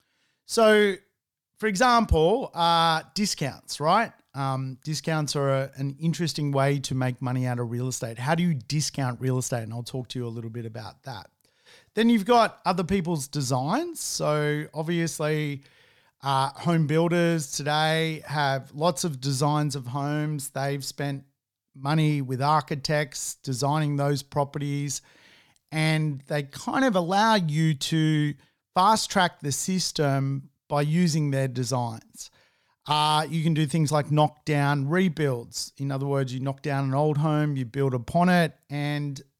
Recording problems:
none

